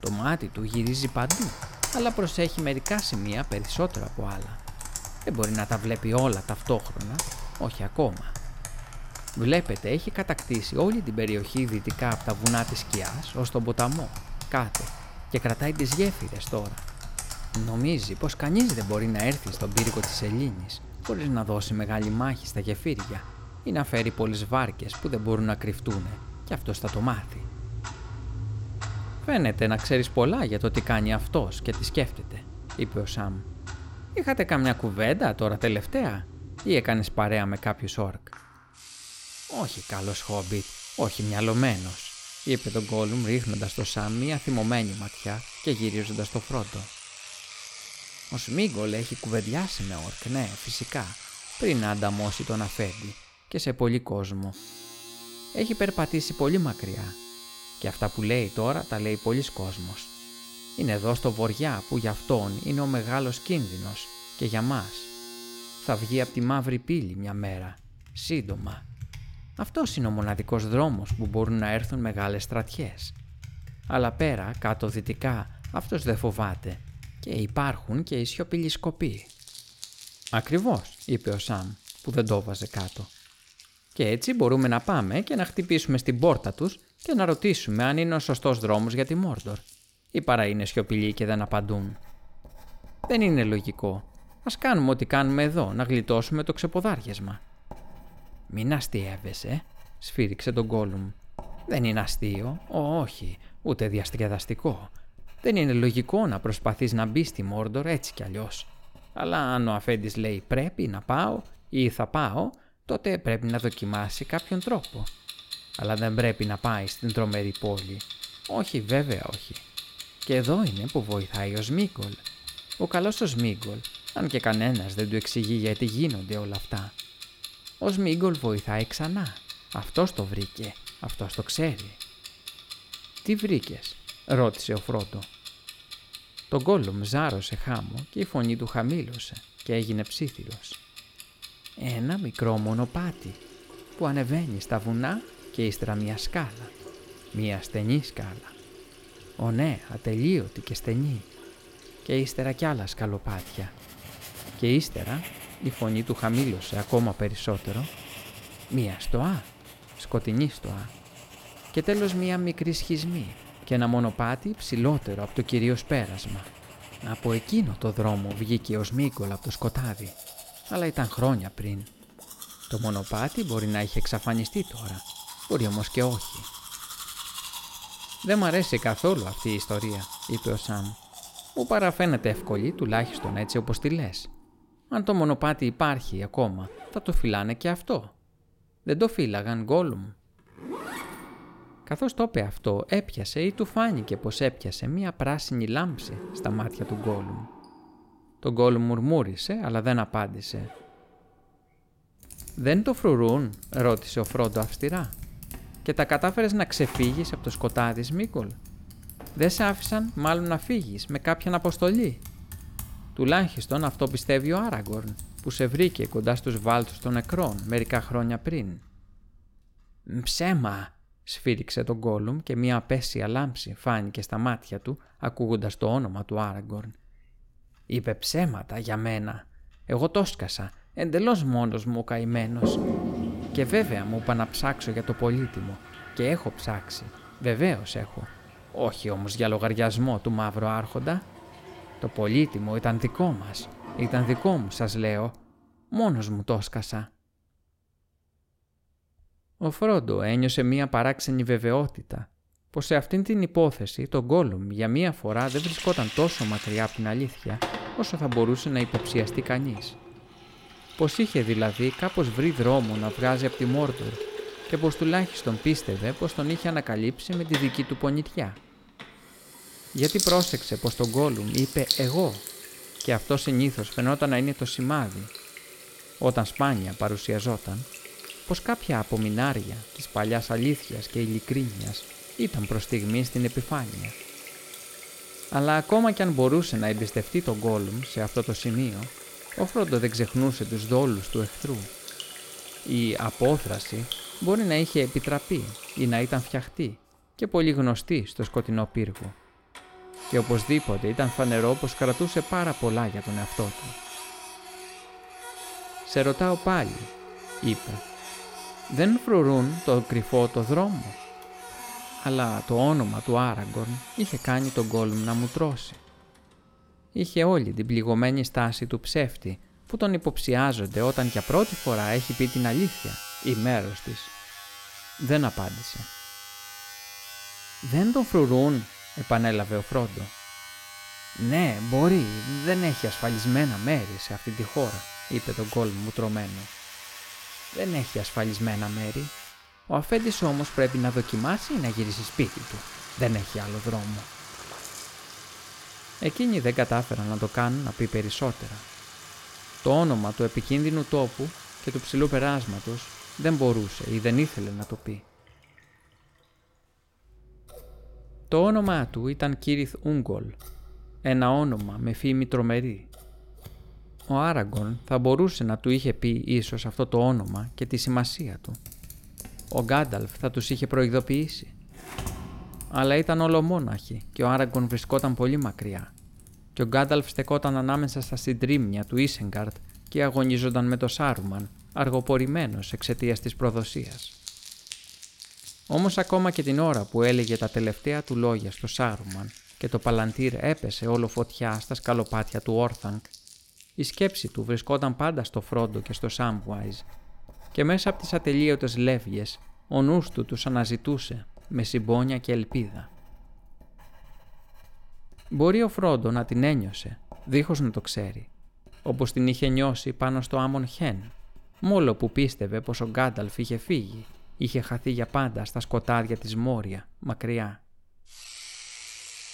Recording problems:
household noises; noticeable; throughout; 10 dB below the speech

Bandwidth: 16.5 kHz